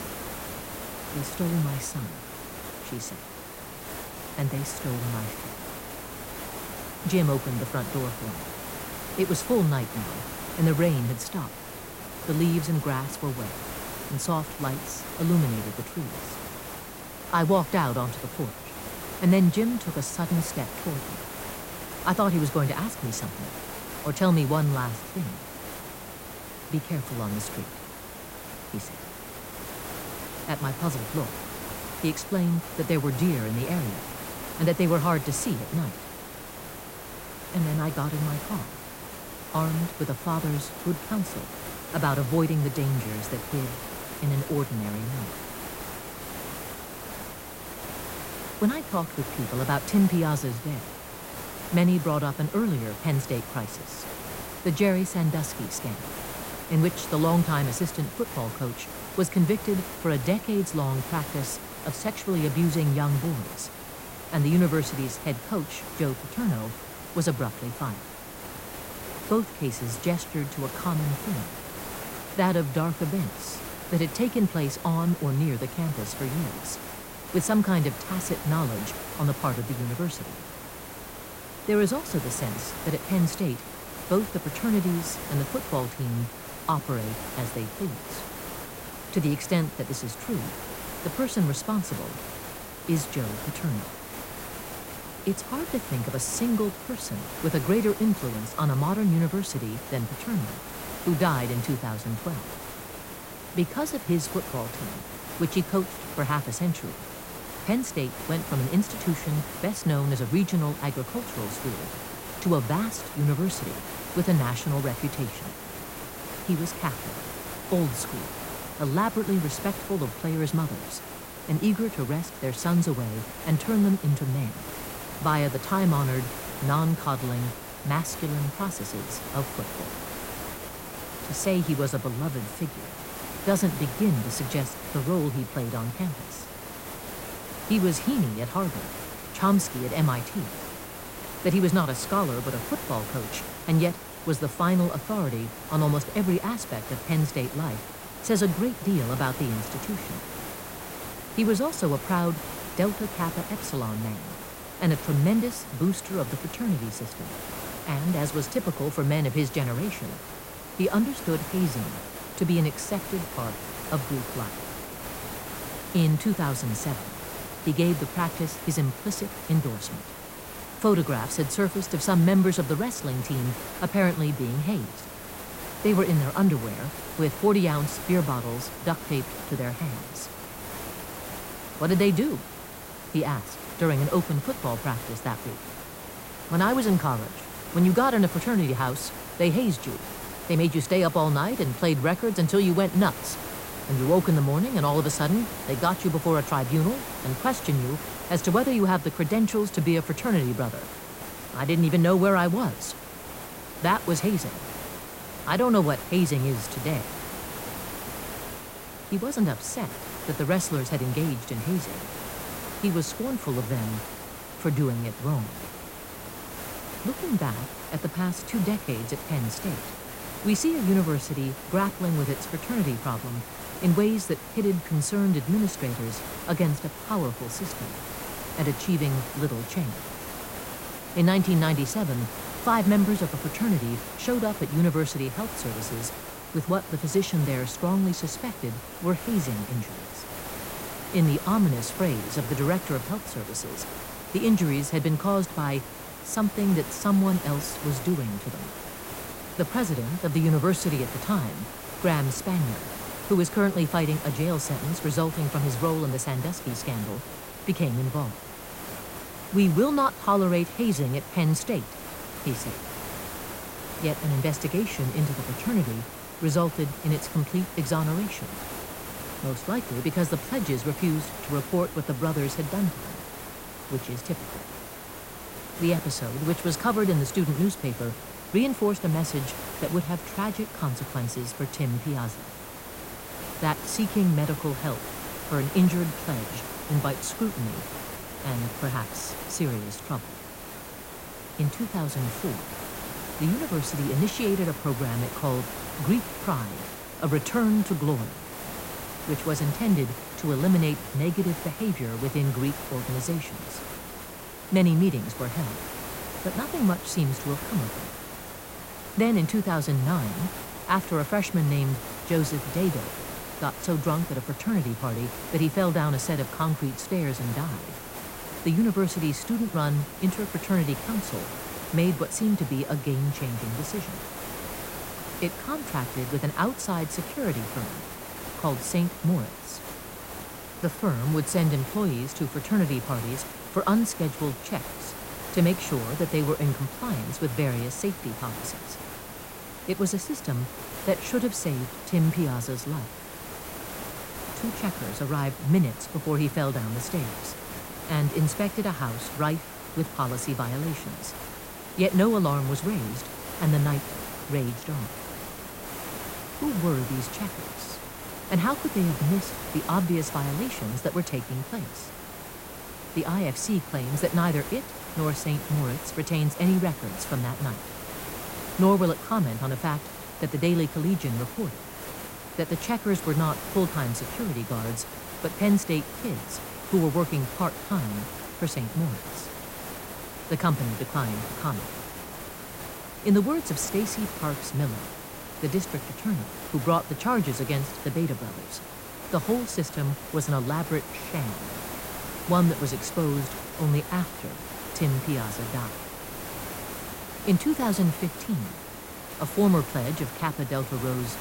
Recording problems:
hiss; loud; throughout; 9 dB below the speech

